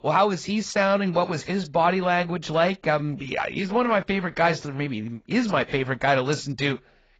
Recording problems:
garbled, watery; badly; nothing above 7.5 kHz

